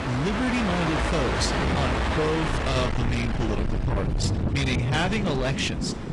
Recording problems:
distortion; heavy; 8 dB below the speech
garbled, watery; slightly
wind noise on the microphone; heavy; from 1.5 s on; 7 dB below the speech
train or aircraft noise; loud; throughout; as loud as the speech

